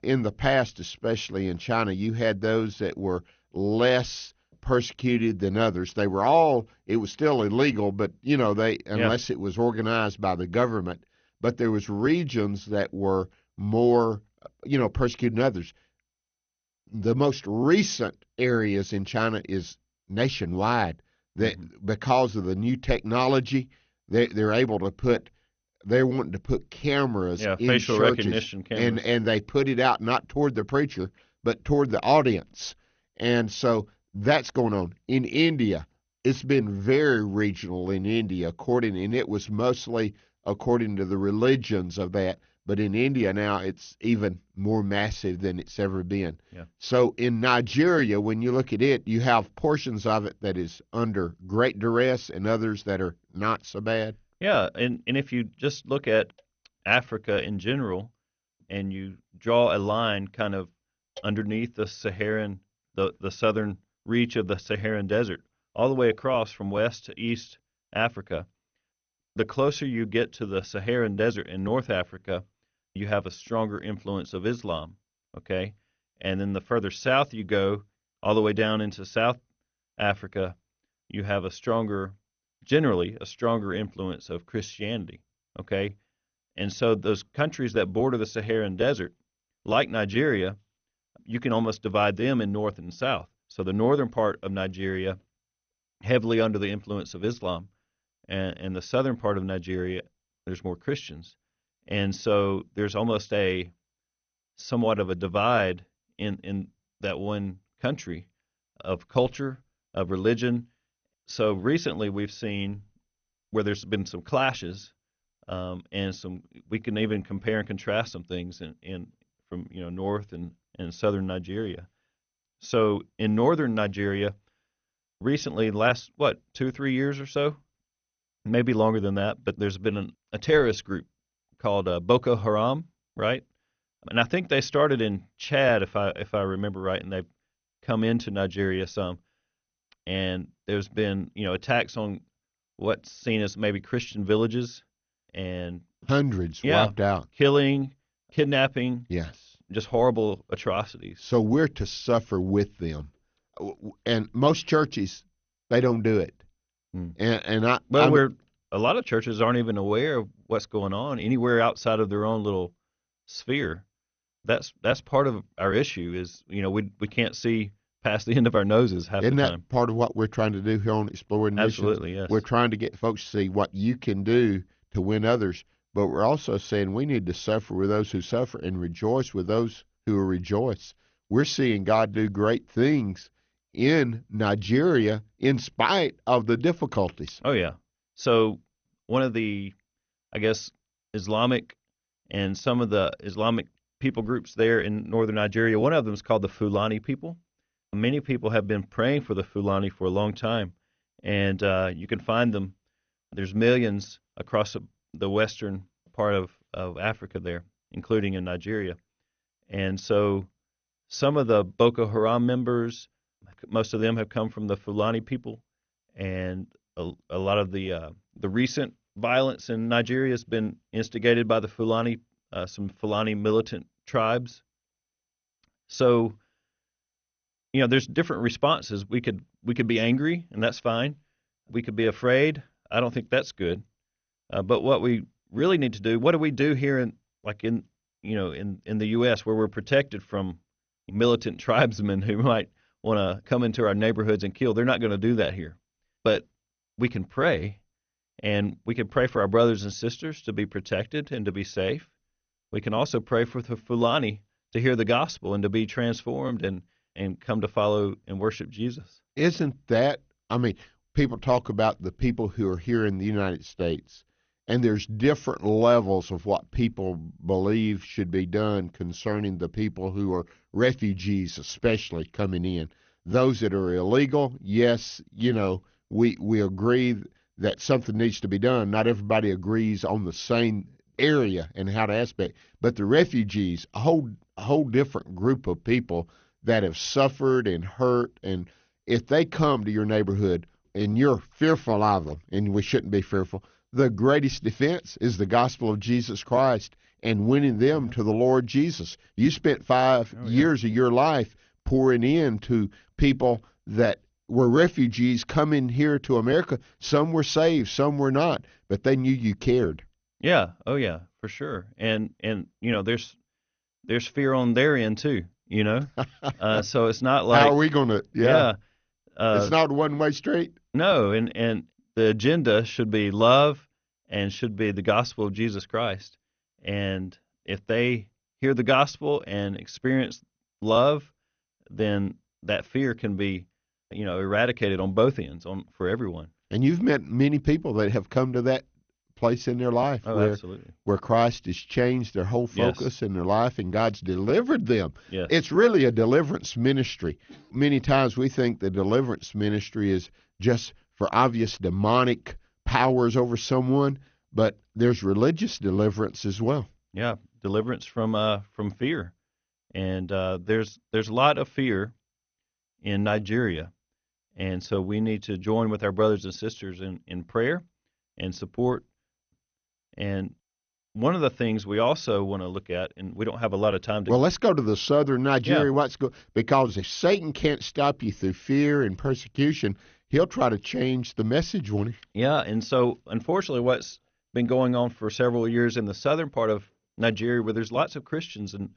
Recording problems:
garbled, watery; slightly; nothing above 6.5 kHz

